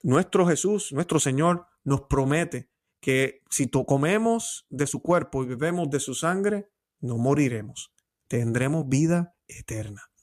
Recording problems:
uneven, jittery; slightly; from 0.5 to 8.5 s

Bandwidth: 14.5 kHz